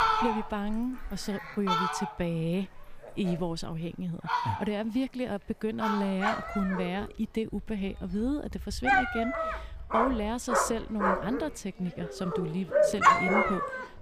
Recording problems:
animal sounds; very loud; throughout; 4 dB above the speech

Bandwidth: 15 kHz